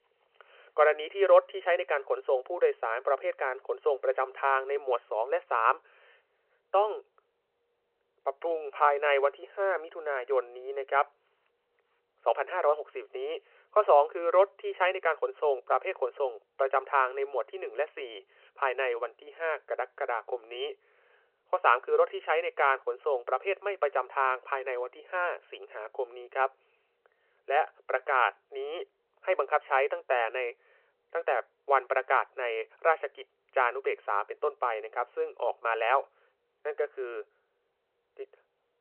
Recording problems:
phone-call audio

